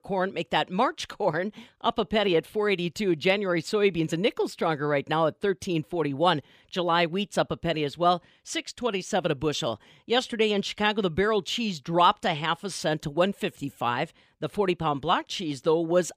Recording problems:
none

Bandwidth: 15 kHz